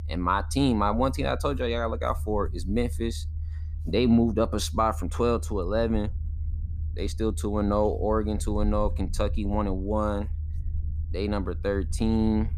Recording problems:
low rumble; faint; throughout; 25 dB below the speech

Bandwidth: 14.5 kHz